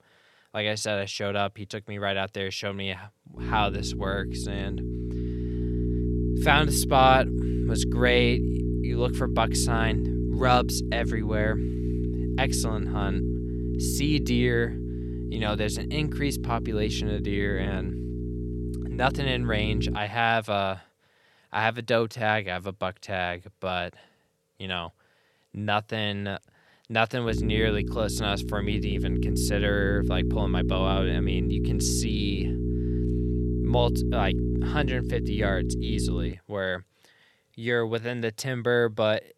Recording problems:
electrical hum; loud; from 3.5 to 20 s and from 27 to 36 s; 60 Hz, 9 dB below the speech

